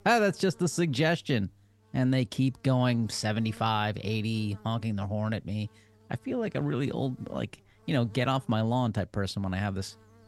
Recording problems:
electrical hum; faint; throughout; 50 Hz, 30 dB below the speech

